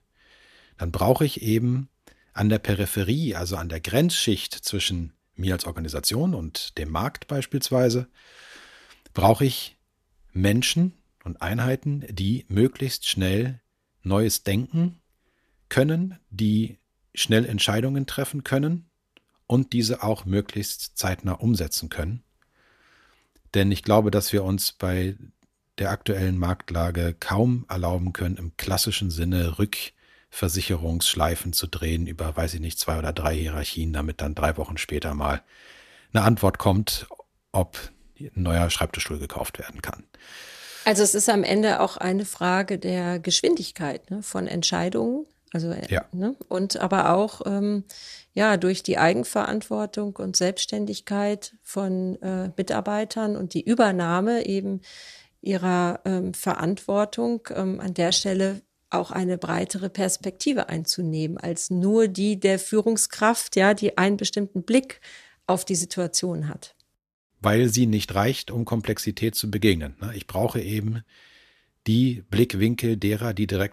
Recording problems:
none

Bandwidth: 14.5 kHz